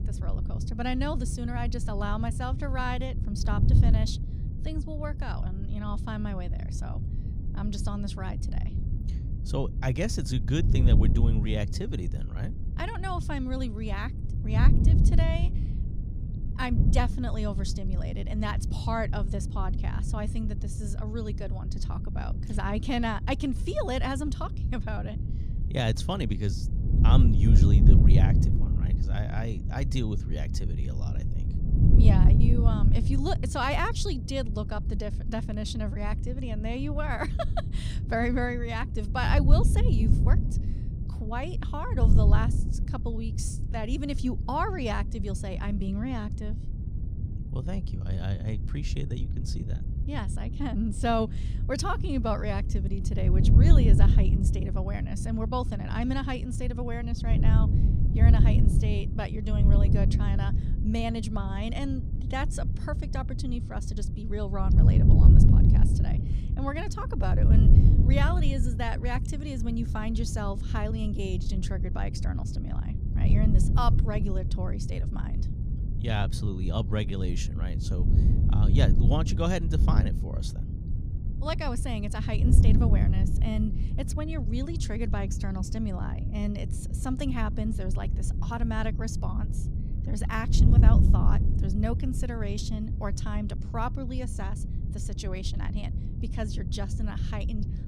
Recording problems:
wind noise on the microphone; heavy; 6 dB below the speech

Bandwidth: 15.5 kHz